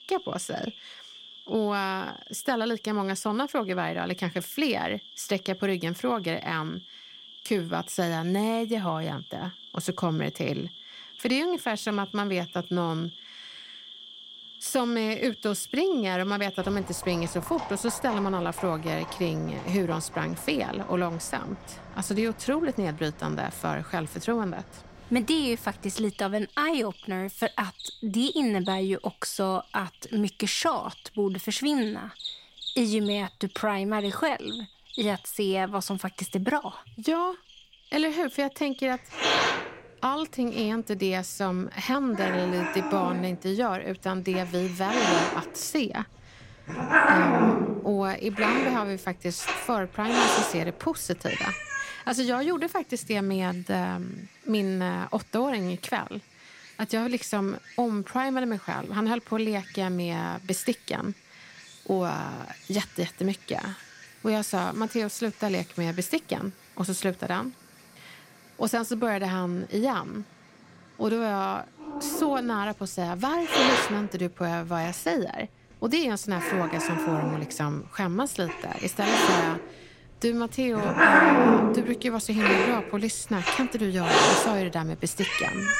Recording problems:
animal sounds; very loud; throughout; 2 dB above the speech

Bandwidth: 16 kHz